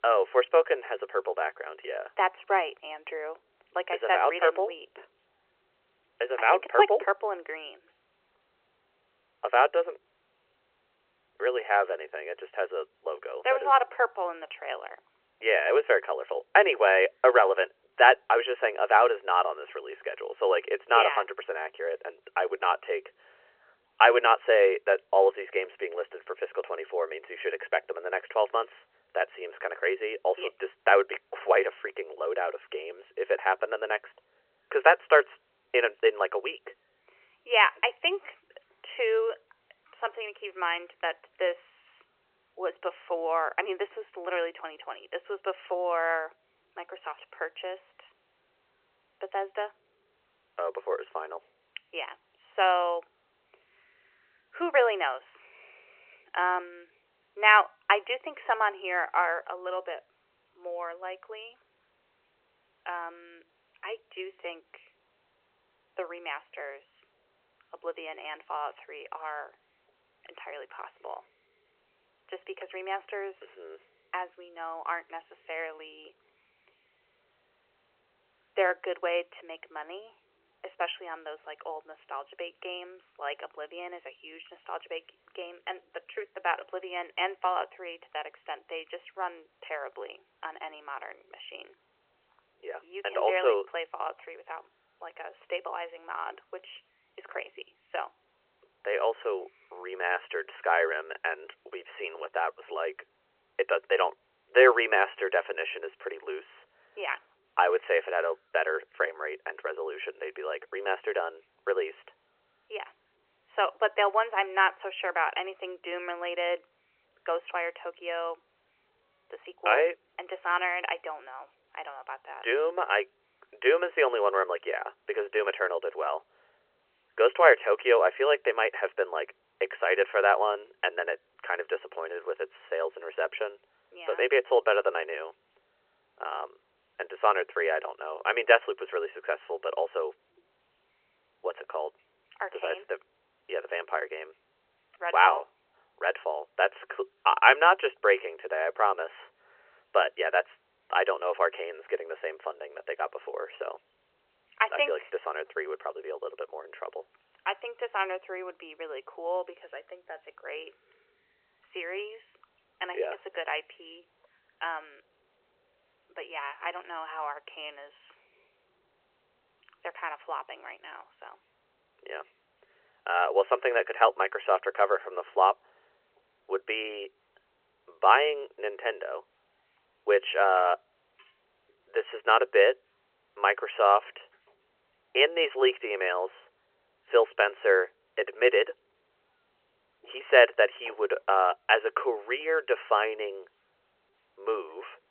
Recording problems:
phone-call audio; nothing above 3 kHz

